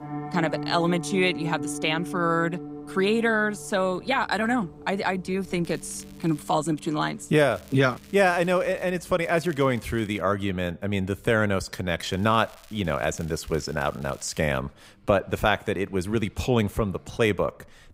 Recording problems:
background music; noticeable; until 12 s; 10 dB below the speech
traffic noise; faint; throughout; 30 dB below the speech
crackling; faint; 4 times, first at 5.5 s; 25 dB below the speech

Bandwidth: 15.5 kHz